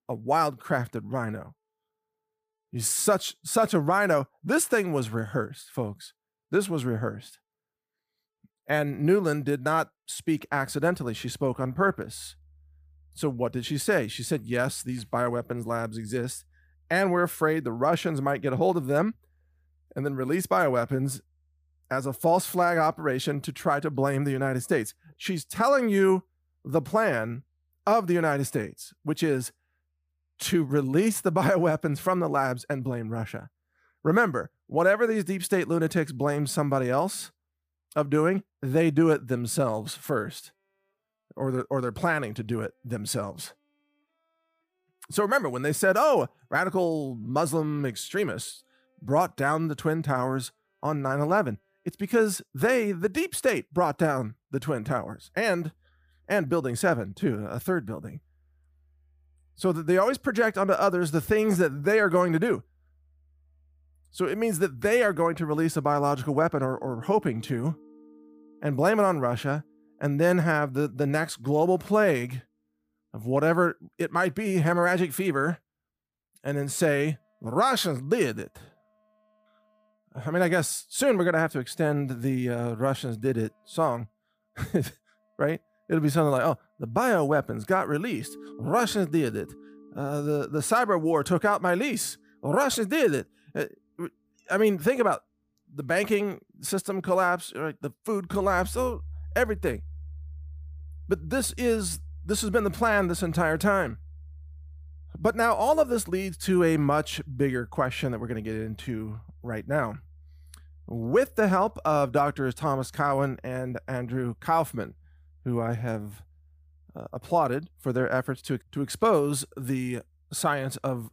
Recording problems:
background music; faint; throughout; 20 dB below the speech

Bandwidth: 15 kHz